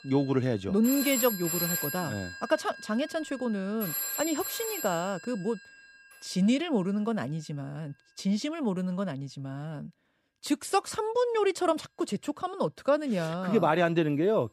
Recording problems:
alarms or sirens; loud; throughout; 4 dB below the speech

